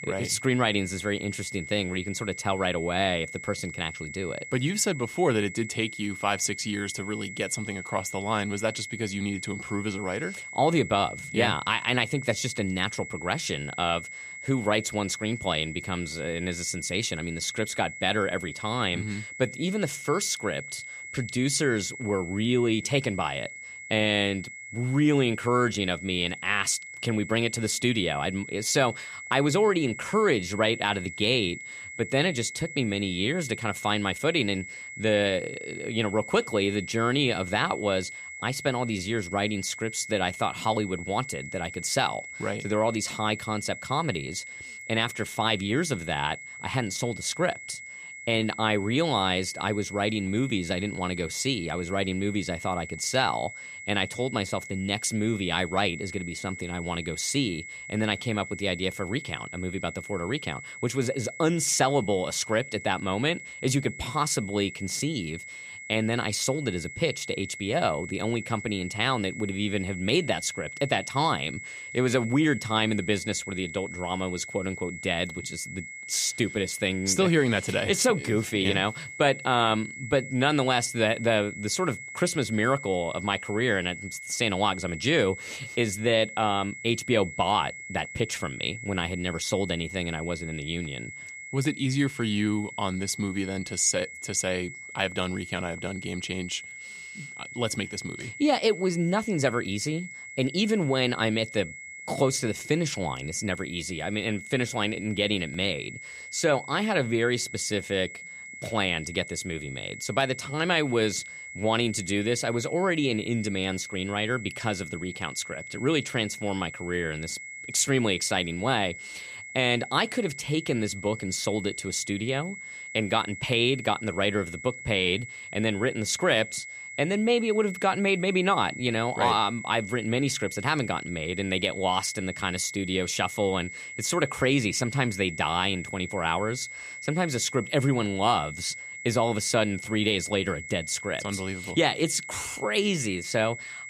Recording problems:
high-pitched whine; noticeable; throughout; 2 kHz, 10 dB below the speech

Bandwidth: 15 kHz